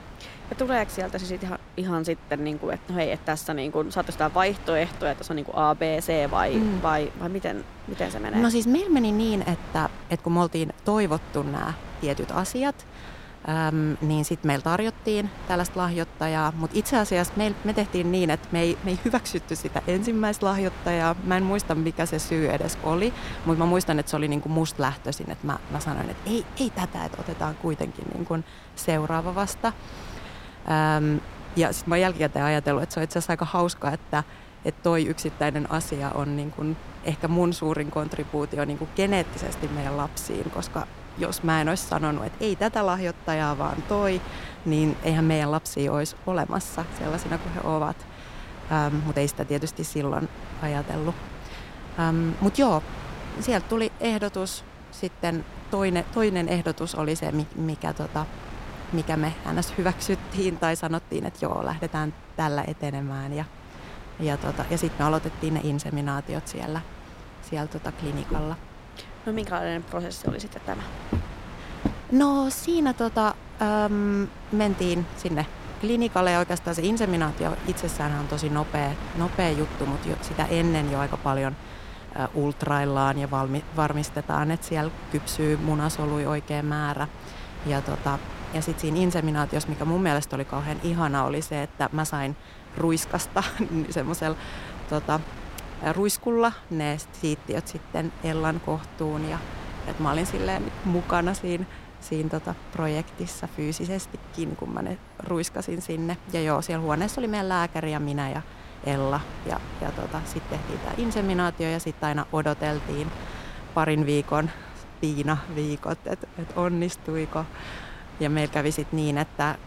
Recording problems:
wind noise on the microphone; occasional gusts; 15 dB below the speech
footsteps; noticeable; from 1:08 to 1:12; peak 5 dB below the speech

